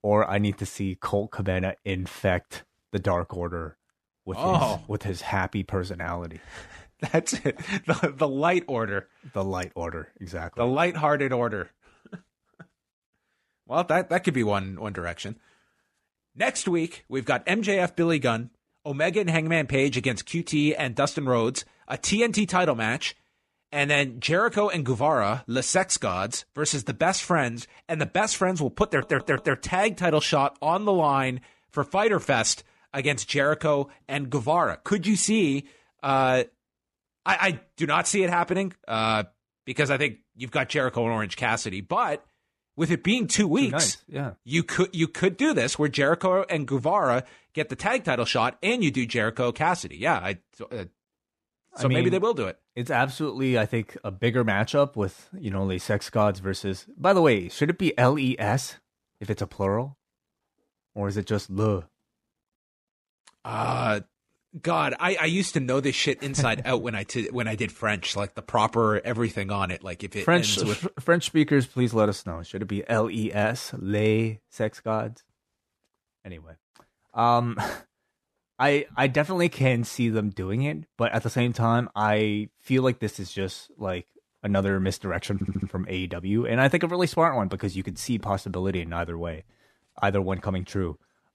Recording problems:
audio stuttering; at 29 s and at 1:25

